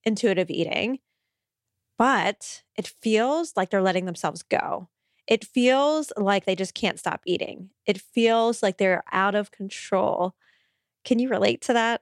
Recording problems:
none

